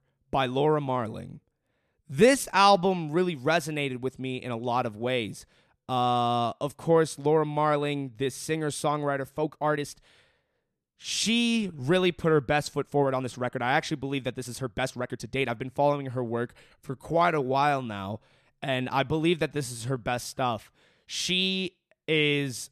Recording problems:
uneven, jittery; strongly; from 2 to 21 s

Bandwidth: 13.5 kHz